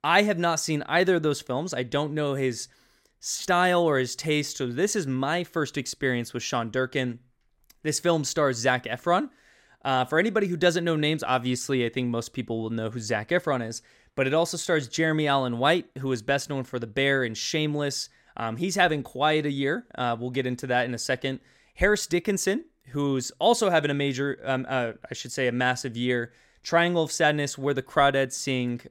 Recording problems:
none

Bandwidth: 16 kHz